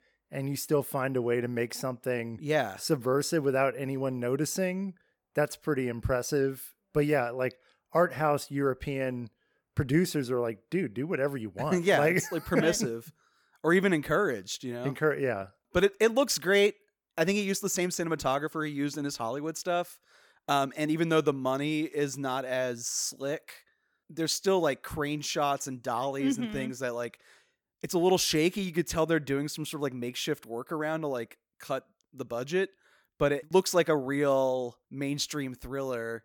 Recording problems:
none

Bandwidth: 18 kHz